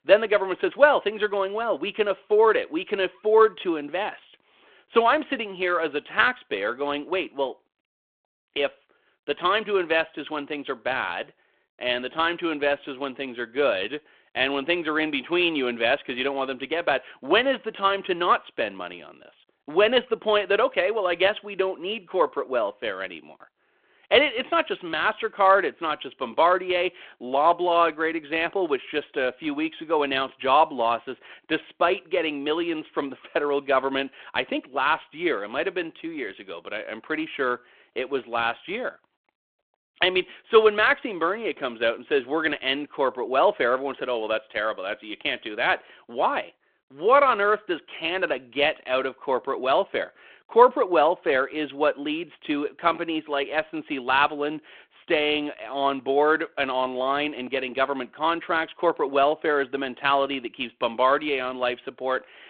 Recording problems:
phone-call audio

